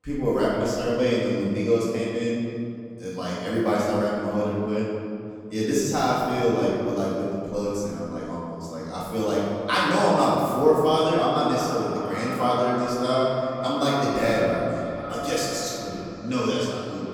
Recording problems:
echo of what is said; strong; from 12 s on; 570 ms later, 10 dB below the speech
room echo; strong; dies away in 2.3 s
off-mic speech; far

